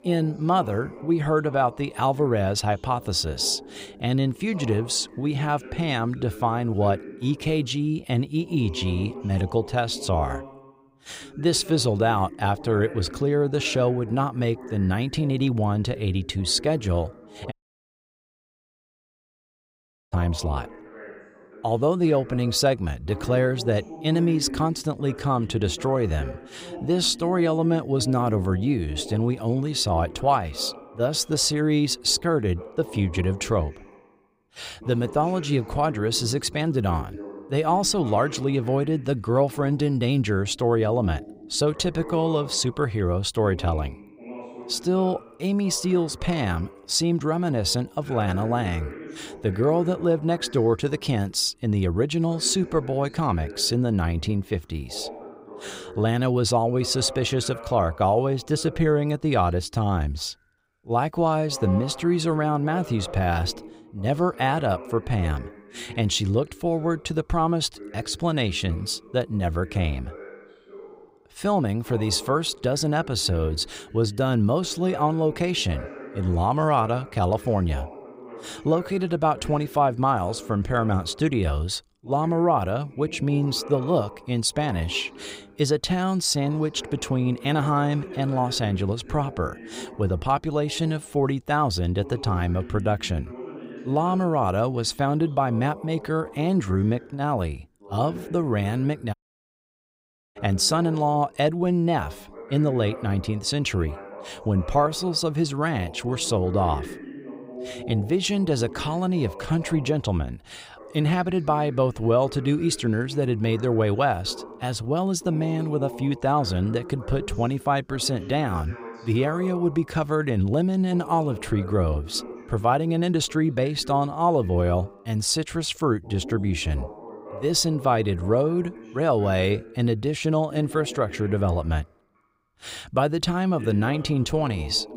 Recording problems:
voice in the background; noticeable; throughout; 15 dB below the speech
audio cutting out; at 18 s for 2.5 s and at 1:39 for 1 s

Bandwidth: 15.5 kHz